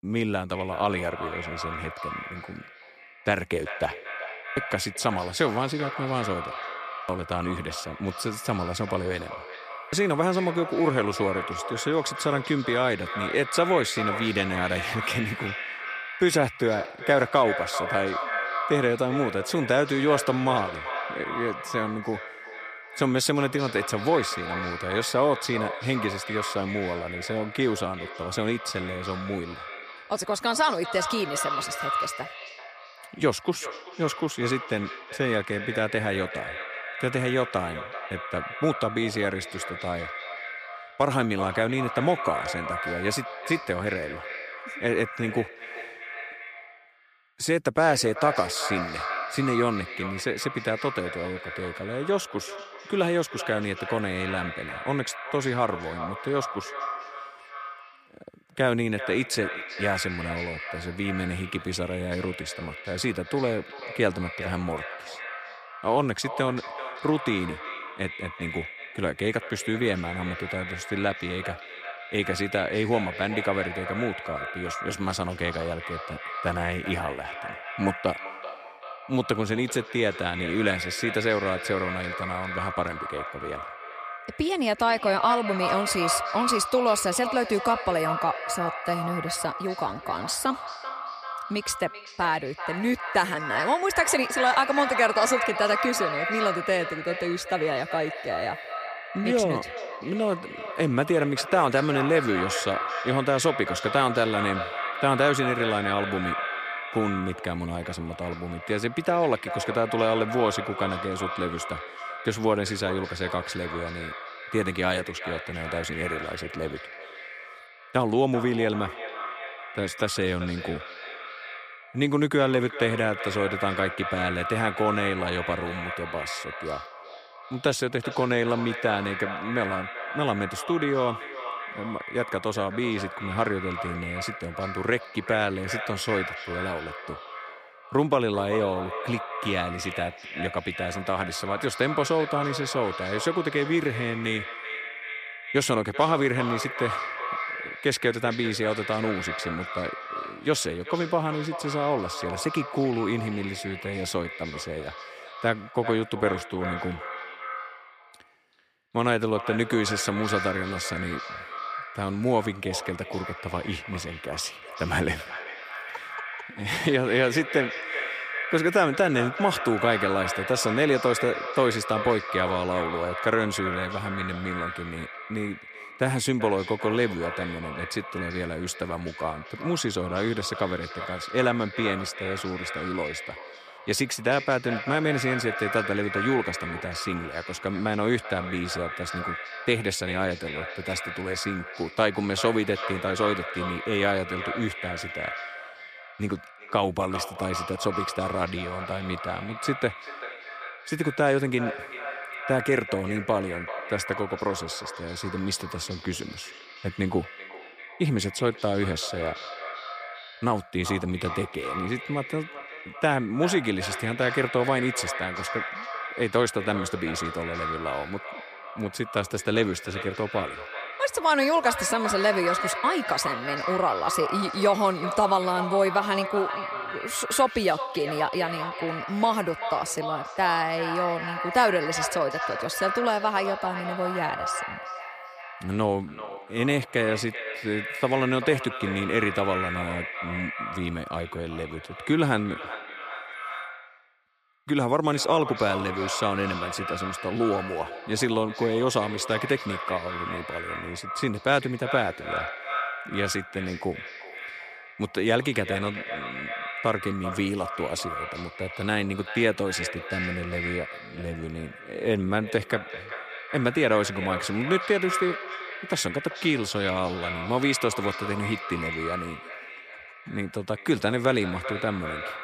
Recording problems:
echo of what is said; strong; throughout; 390 ms later, 6 dB below the speech

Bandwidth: 15 kHz